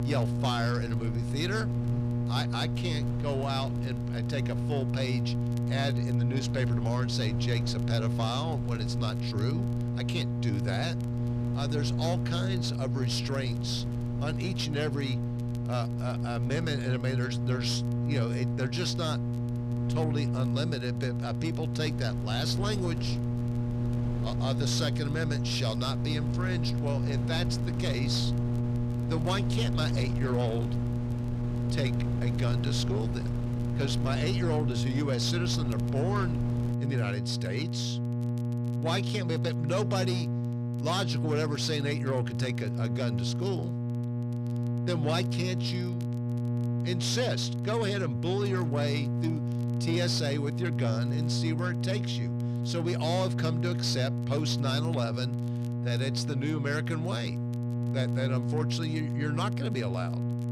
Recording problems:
distortion; slight; 10 dB below the speech
electrical hum; loud; throughout; 60 Hz, 5 dB below the speech
wind noise on the microphone; occasional gusts; until 37 s; 15 dB below the speech
crackle, like an old record; faint; 25 dB below the speech

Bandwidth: 13.5 kHz